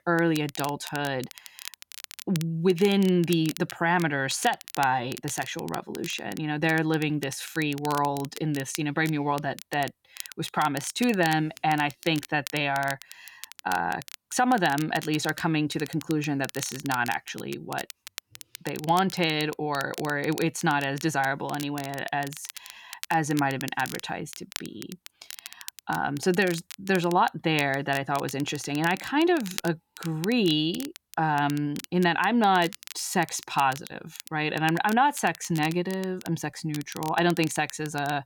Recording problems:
crackle, like an old record; noticeable; 15 dB below the speech

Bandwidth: 17.5 kHz